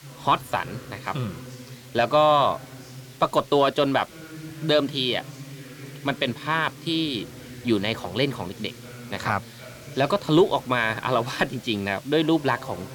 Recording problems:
background chatter; noticeable; throughout; 3 voices, 20 dB below the speech
hiss; faint; throughout; 25 dB below the speech

